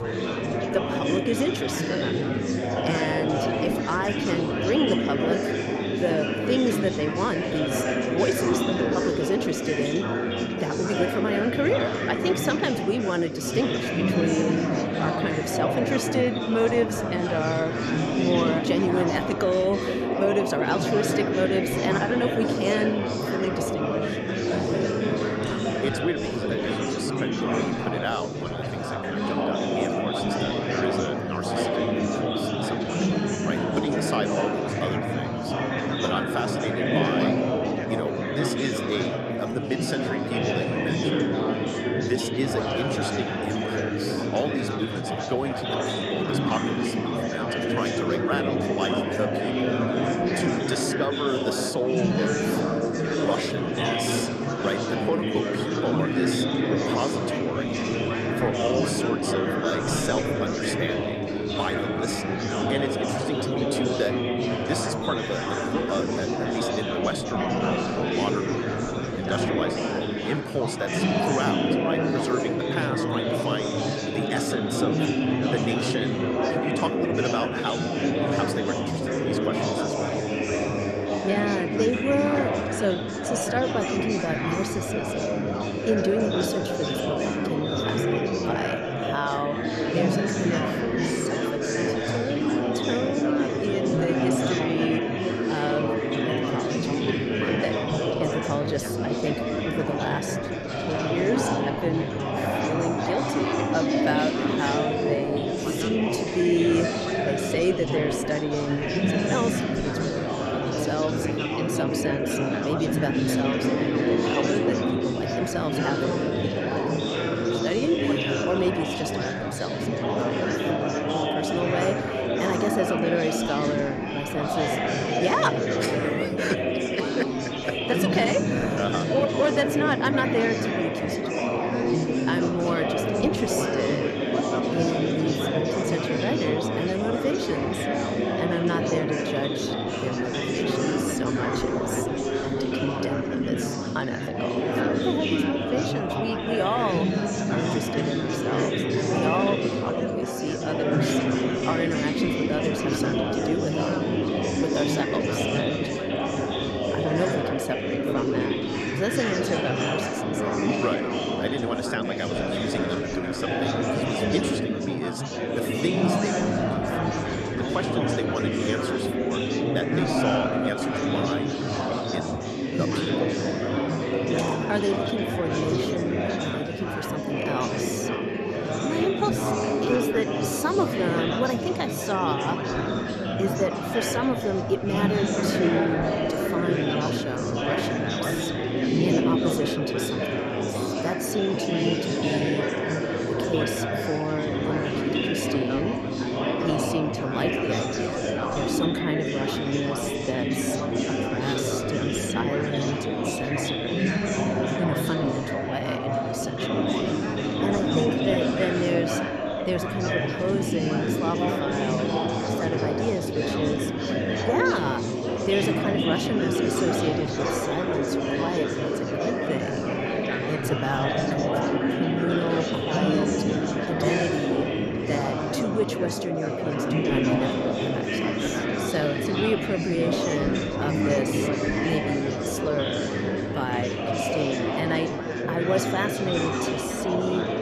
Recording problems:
chatter from many people; very loud; throughout; 4 dB above the speech

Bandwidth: 13.5 kHz